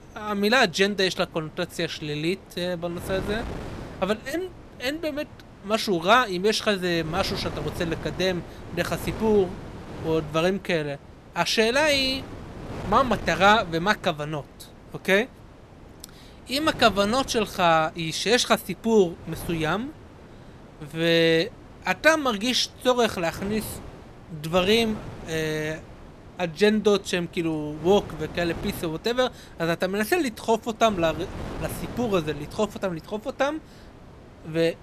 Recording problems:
wind noise on the microphone; occasional gusts; 20 dB below the speech

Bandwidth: 14 kHz